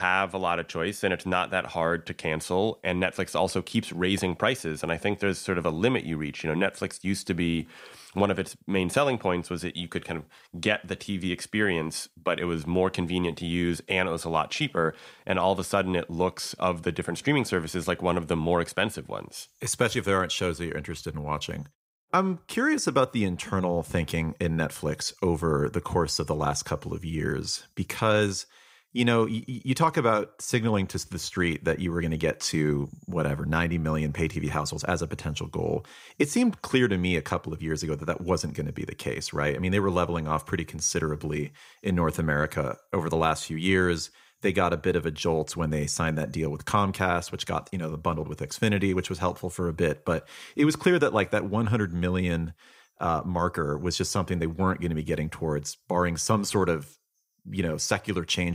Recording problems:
abrupt cut into speech; at the start and the end

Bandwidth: 15.5 kHz